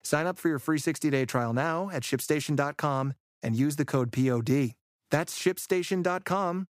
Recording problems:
none

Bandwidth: 15 kHz